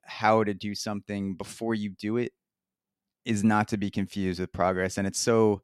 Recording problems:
none

